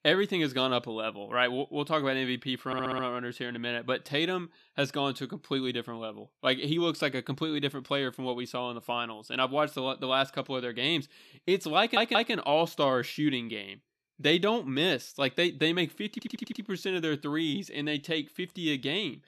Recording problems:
audio stuttering; at 2.5 s, at 12 s and at 16 s

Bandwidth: 13.5 kHz